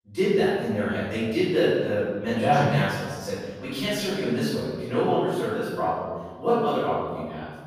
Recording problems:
room echo; strong; dies away in 1.3 s
off-mic speech; far

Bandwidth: 15 kHz